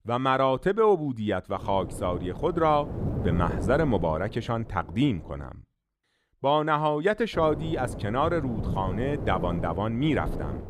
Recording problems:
wind noise on the microphone; occasional gusts; from 1.5 to 5.5 s and from 7.5 s on; 15 dB below the speech

